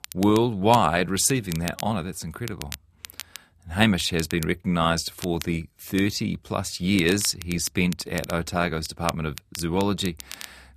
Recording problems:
crackle, like an old record; noticeable; 15 dB below the speech

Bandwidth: 14.5 kHz